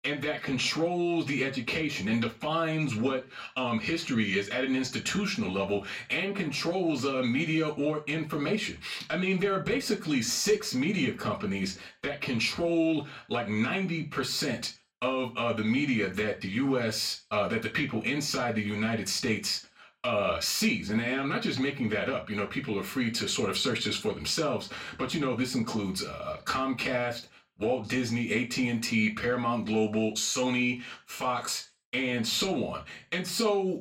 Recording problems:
off-mic speech; far
room echo; very slight; dies away in 0.3 s

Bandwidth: 16 kHz